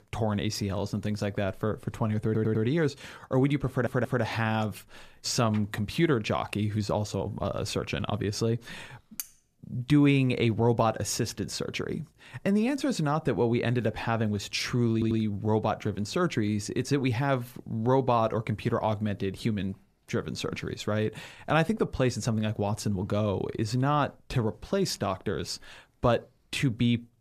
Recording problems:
audio stuttering; at 2.5 s, at 3.5 s and at 15 s
clattering dishes; very faint; at 9 s; peak 10 dB below the speech

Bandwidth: 14.5 kHz